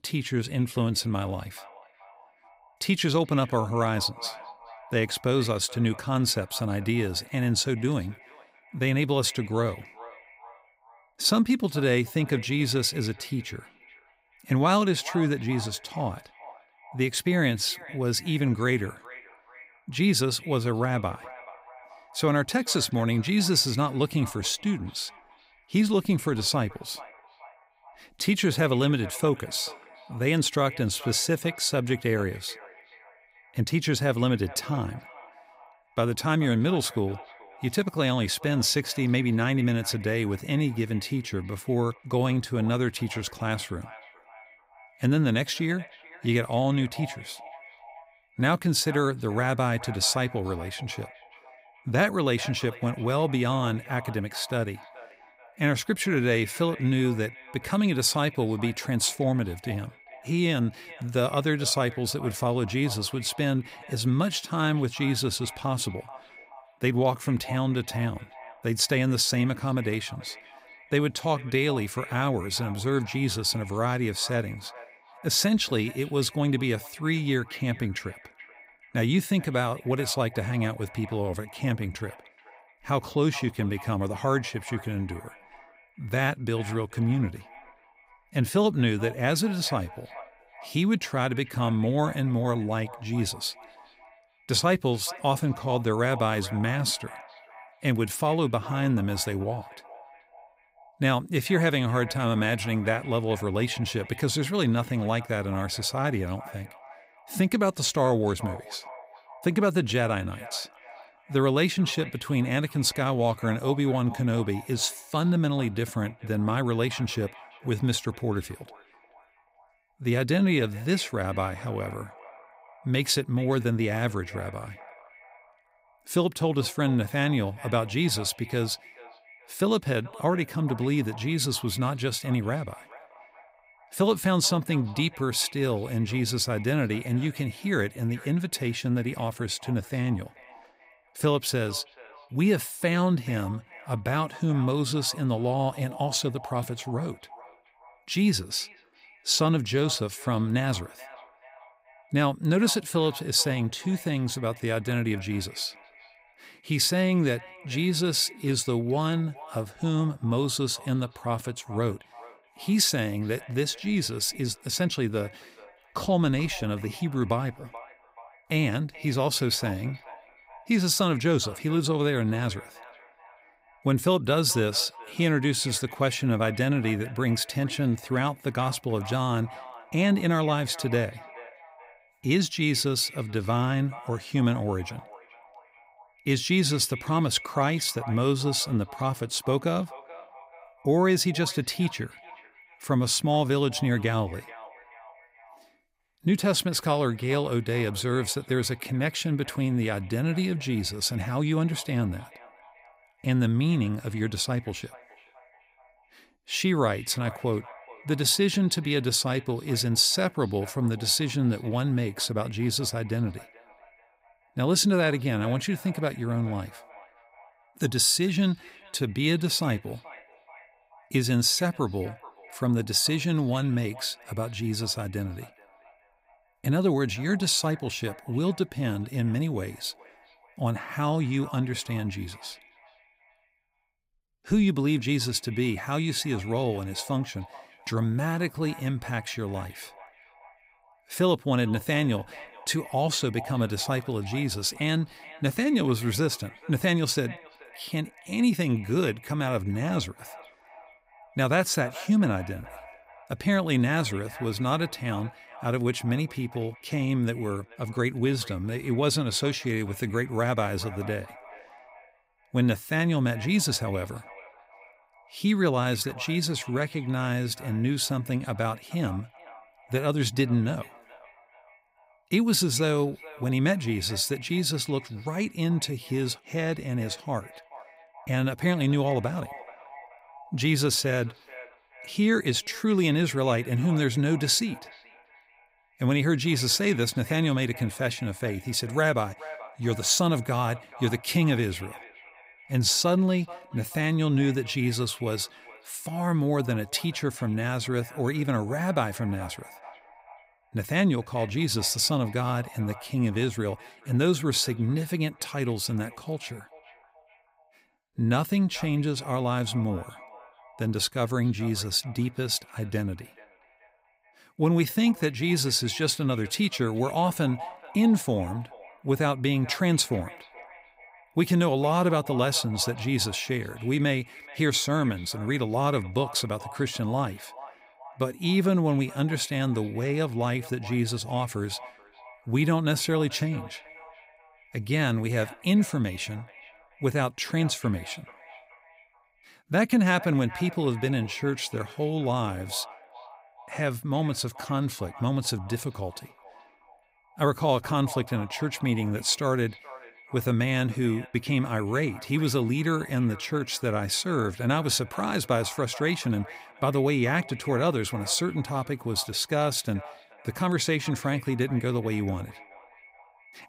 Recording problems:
echo of what is said; faint; throughout; 430 ms later, 20 dB below the speech

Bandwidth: 15.5 kHz